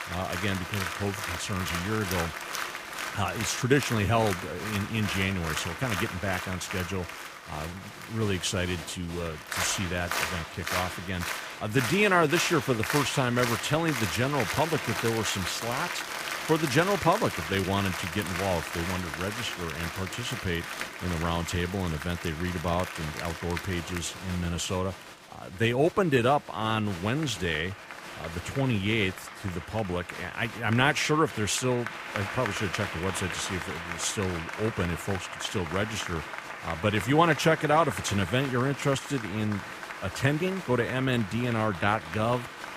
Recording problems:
crowd noise; loud; throughout; 6 dB below the speech

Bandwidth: 15 kHz